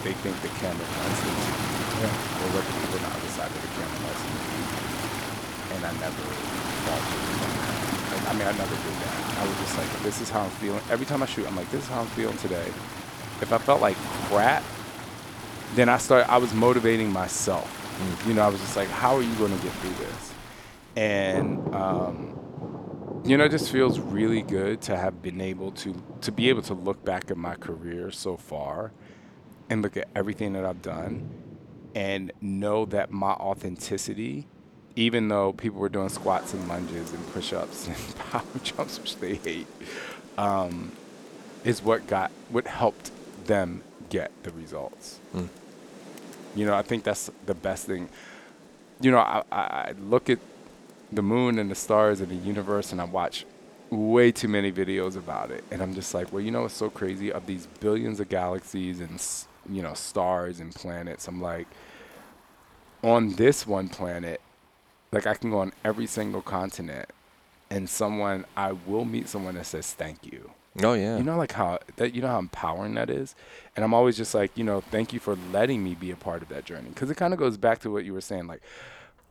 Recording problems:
rain or running water; loud; throughout; 6 dB below the speech

